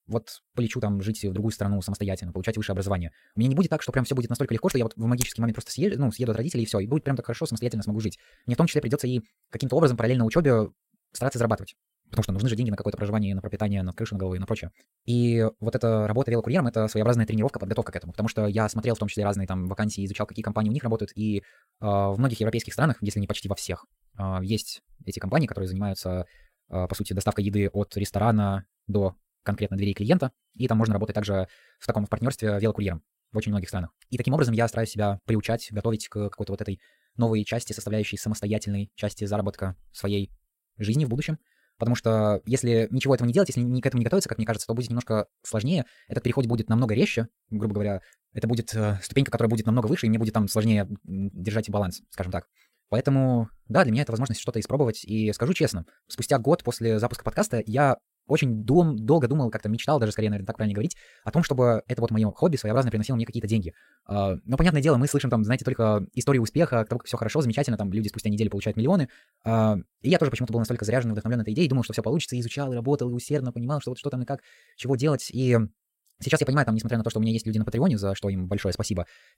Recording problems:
wrong speed, natural pitch; too fast; 1.7 times normal speed

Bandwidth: 16 kHz